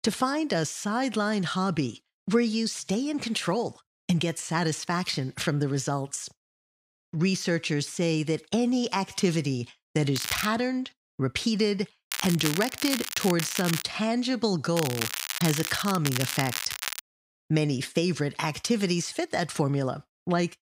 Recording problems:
crackling; loud; 4 times, first at 10 s; 4 dB below the speech

